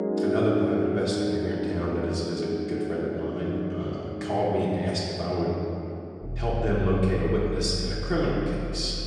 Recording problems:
off-mic speech; far
room echo; noticeable; dies away in 2.5 s
background music; loud; throughout; 4 dB below the speech

